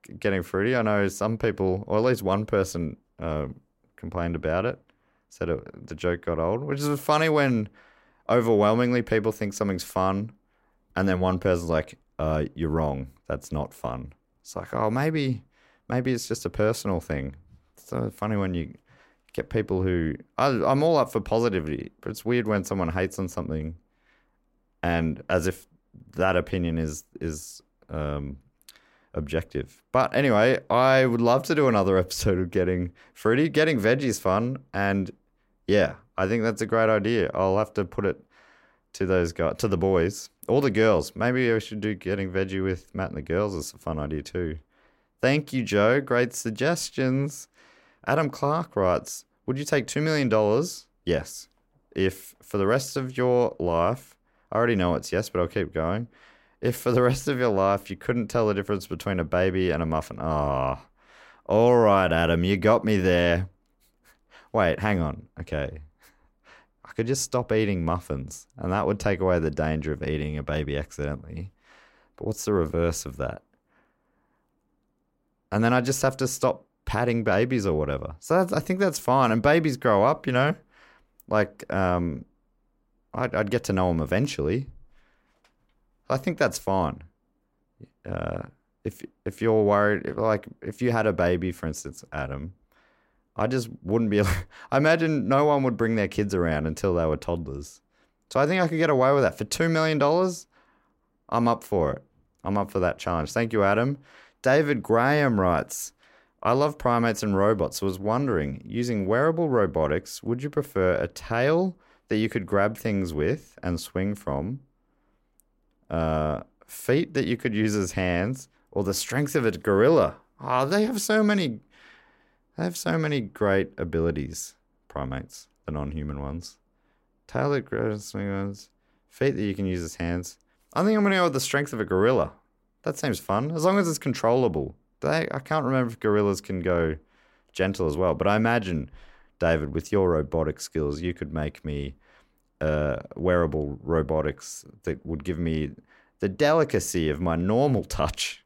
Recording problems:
none

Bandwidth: 16 kHz